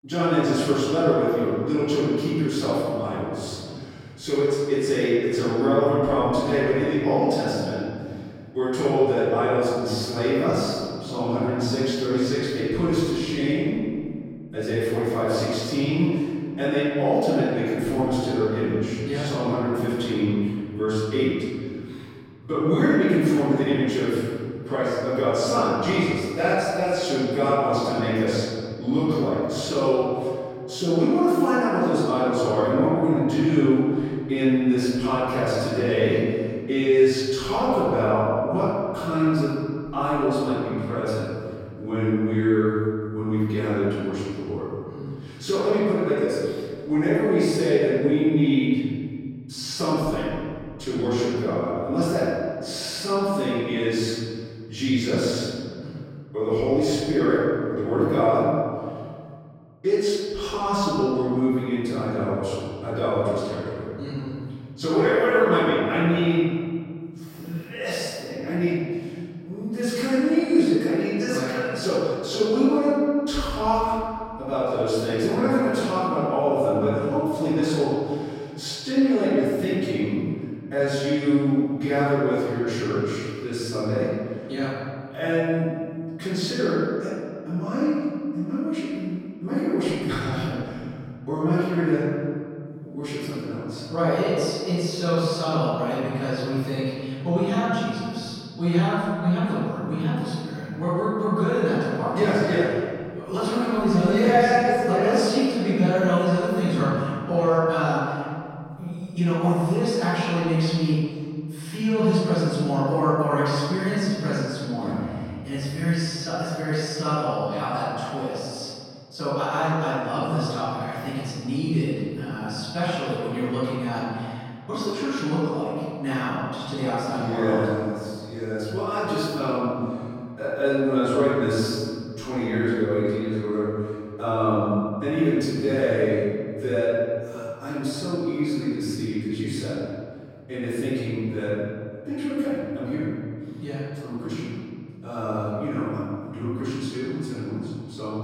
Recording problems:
room echo; strong; dies away in 2.2 s
off-mic speech; far

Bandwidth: 16 kHz